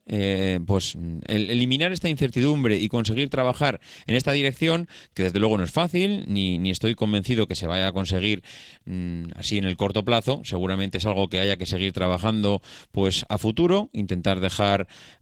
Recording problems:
garbled, watery; slightly; nothing above 19 kHz

